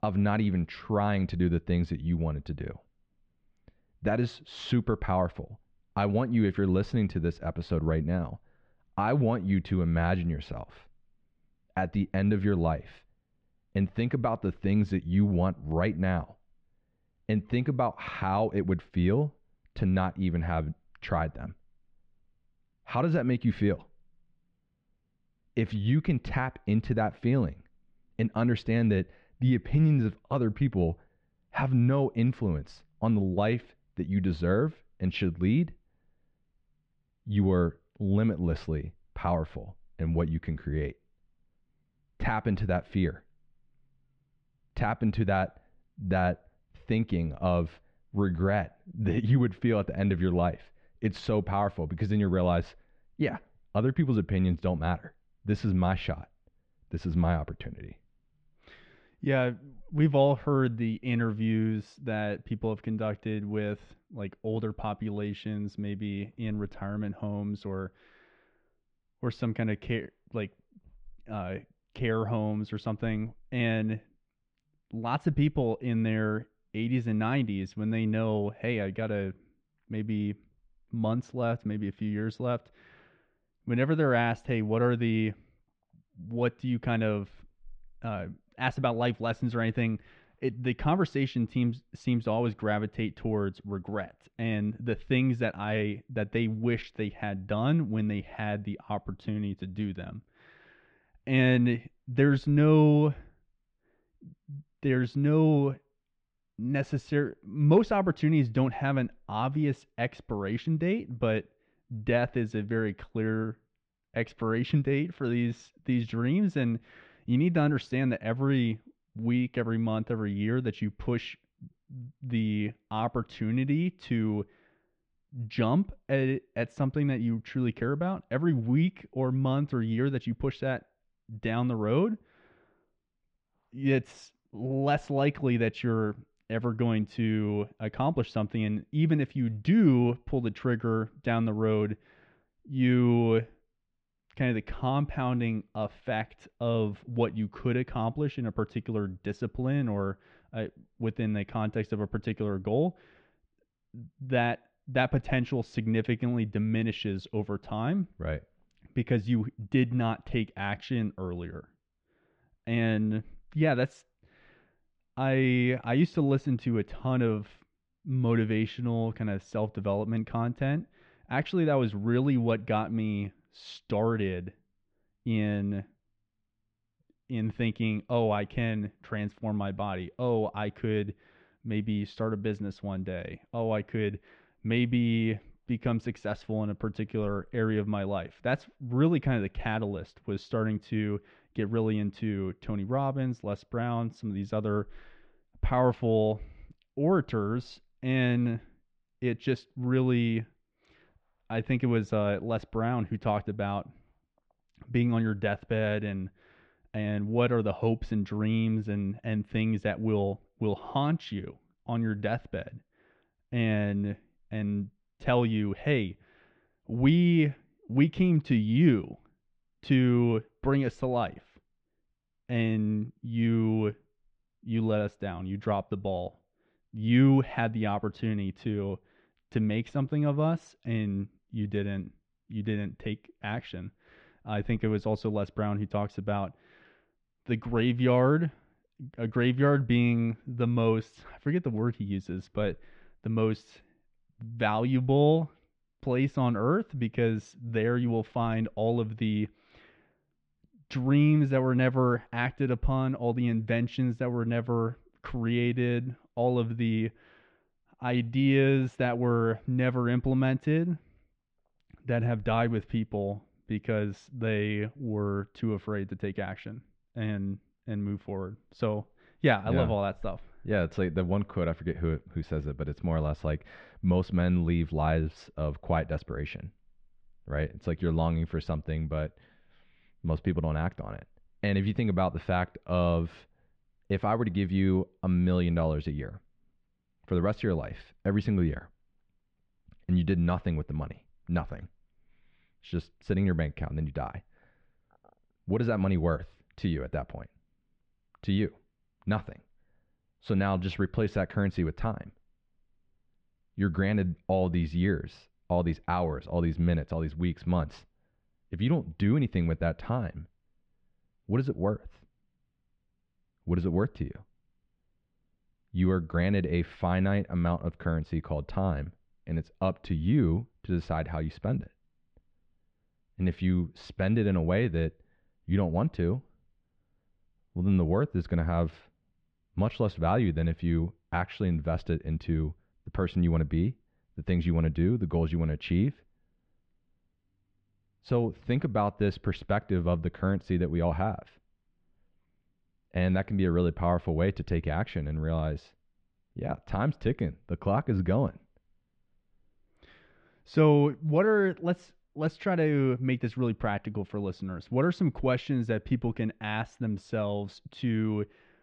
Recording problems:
muffled; very; fading above 3.5 kHz

